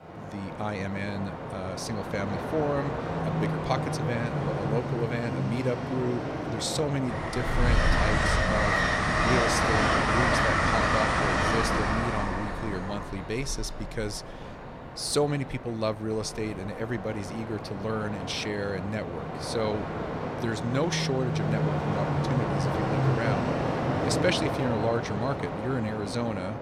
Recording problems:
train or aircraft noise; very loud; throughout; 3 dB above the speech

